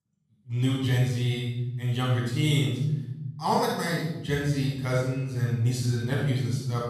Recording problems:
room echo; strong; dies away in 1.5 s
off-mic speech; far

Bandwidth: 13.5 kHz